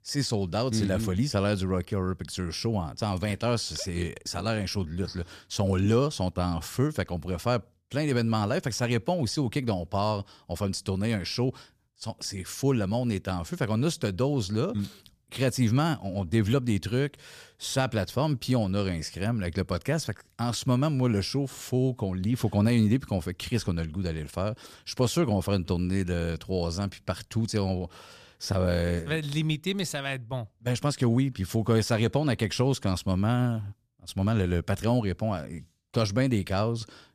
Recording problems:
none

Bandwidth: 14.5 kHz